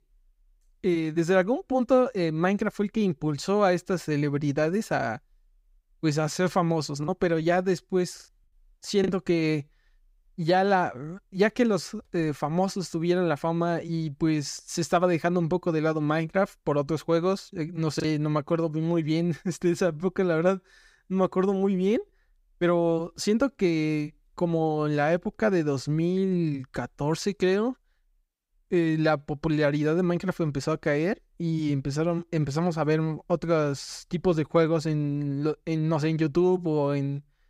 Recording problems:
choppy; occasionally; from 7 to 9 s and at 18 s; 2% of the speech affected

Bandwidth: 15.5 kHz